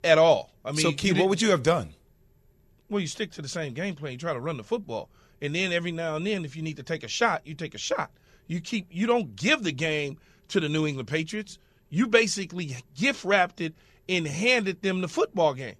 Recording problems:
none

